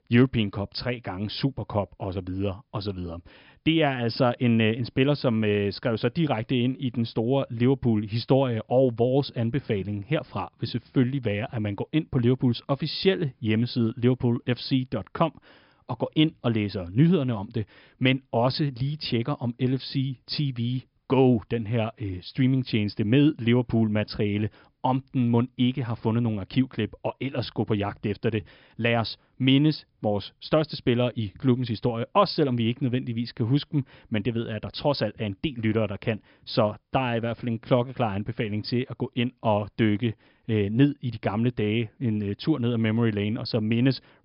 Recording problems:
high frequencies cut off; noticeable; nothing above 5.5 kHz

